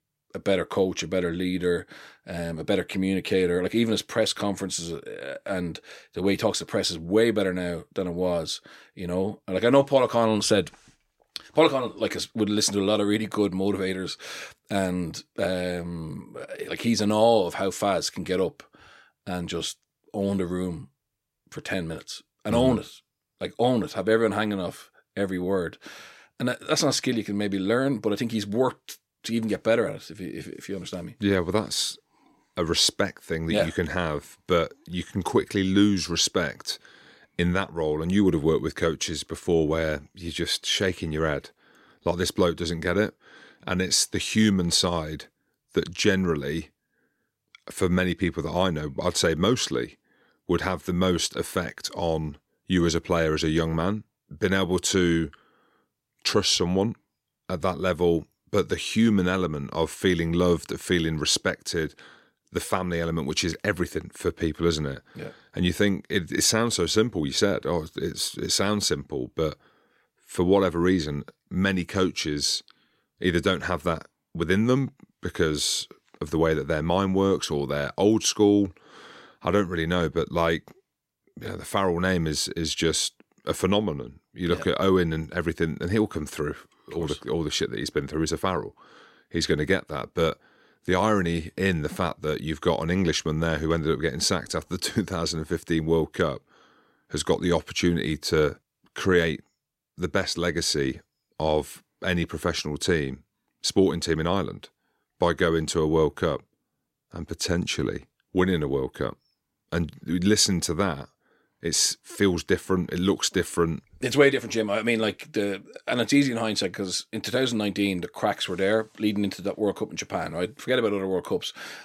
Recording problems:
none

